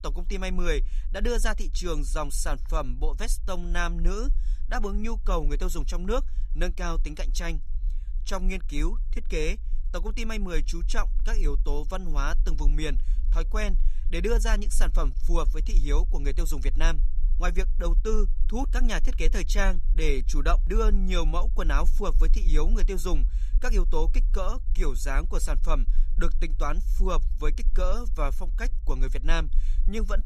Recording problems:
low rumble; faint; throughout; 25 dB below the speech

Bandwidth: 14.5 kHz